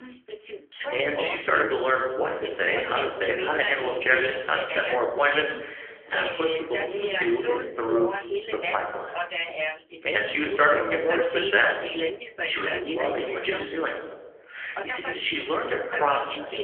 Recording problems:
phone-call audio; poor line; nothing above 3.5 kHz
thin; very; fading below 350 Hz
room echo; slight; dies away in 0.9 s
off-mic speech; somewhat distant
voice in the background; loud; throughout; 5 dB below the speech

